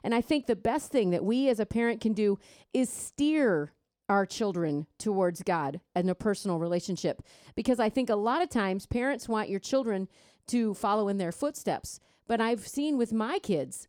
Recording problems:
none

